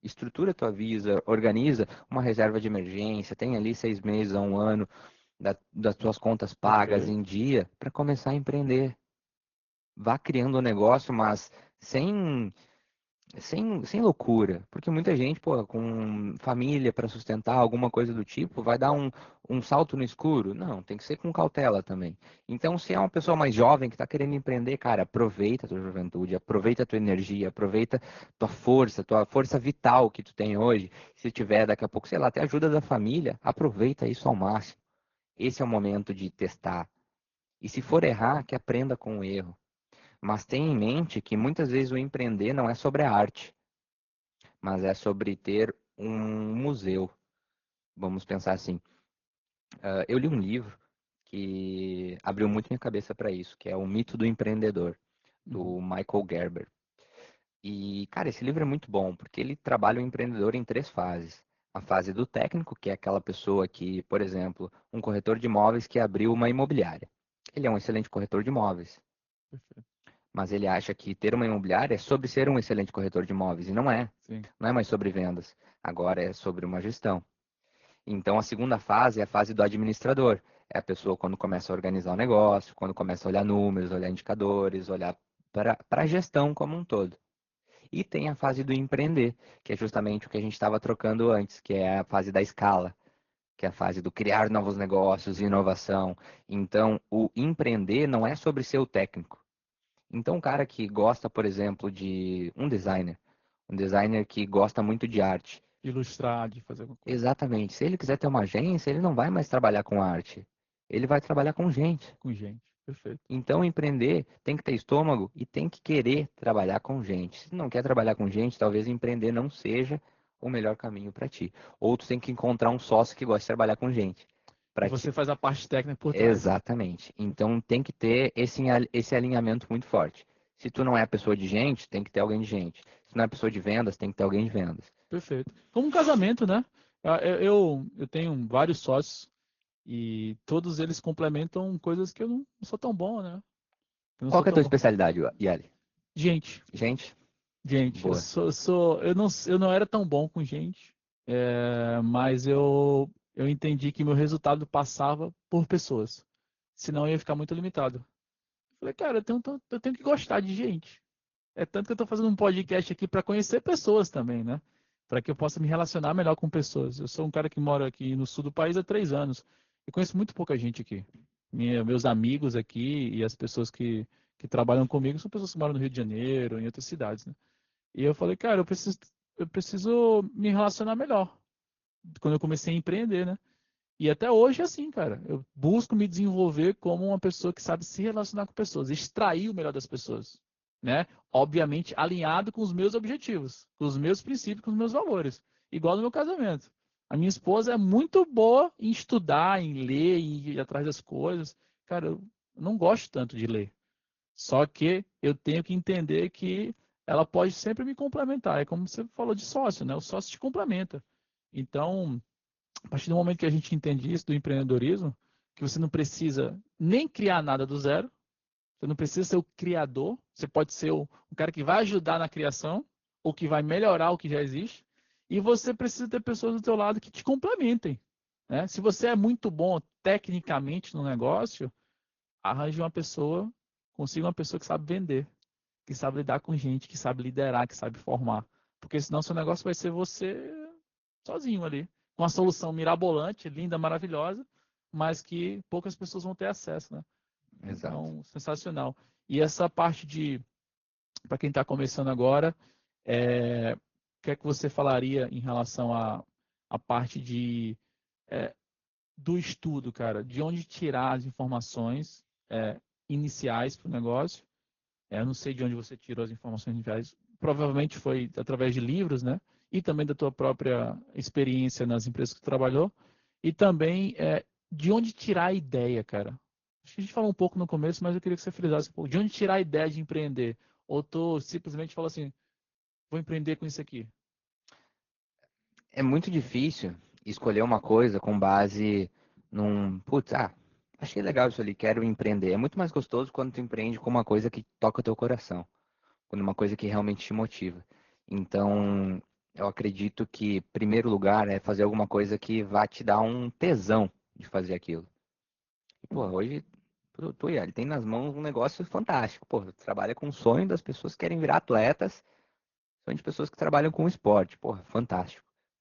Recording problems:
high frequencies cut off; noticeable; nothing above 6.5 kHz
garbled, watery; slightly

